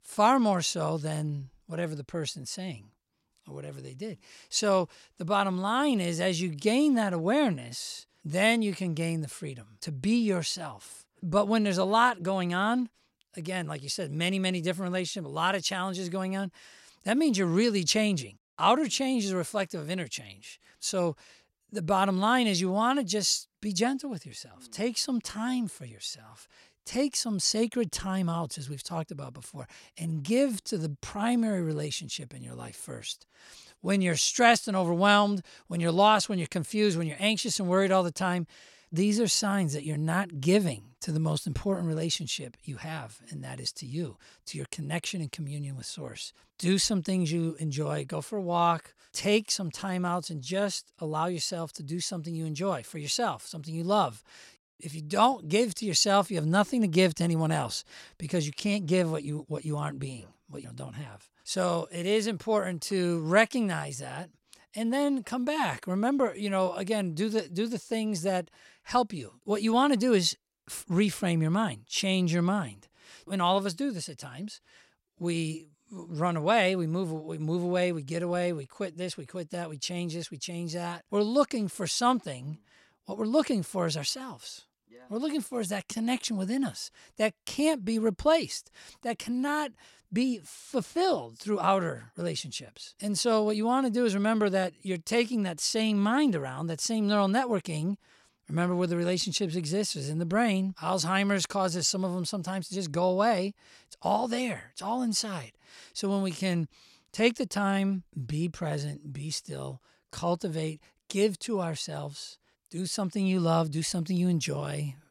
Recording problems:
none

